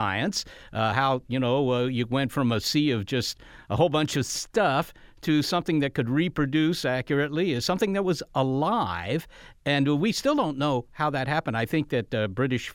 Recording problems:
abrupt cut into speech; at the start

